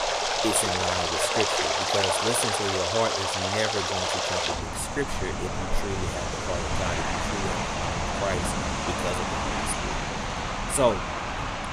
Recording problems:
rain or running water; very loud; throughout; 4 dB above the speech

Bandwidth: 14.5 kHz